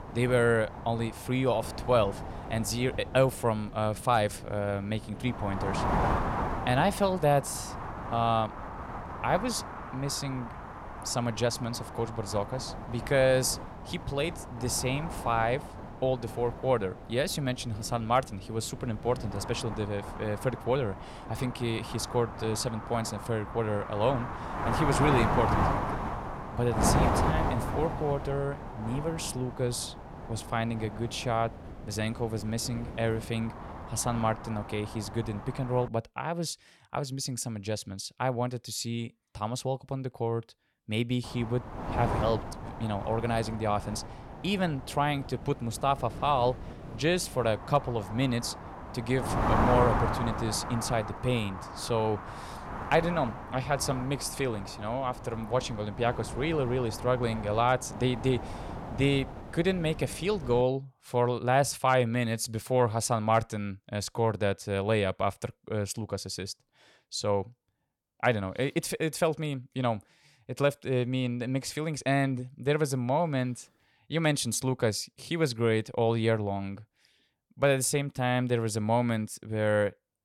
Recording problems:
wind noise on the microphone; heavy; until 36 s and from 41 s to 1:01; 5 dB below the speech

